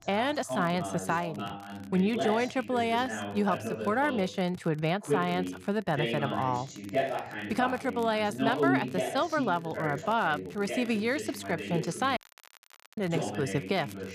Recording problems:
voice in the background; loud; throughout; 5 dB below the speech
crackle, like an old record; faint; 25 dB below the speech
audio cutting out; at 12 s for 1 s

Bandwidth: 14.5 kHz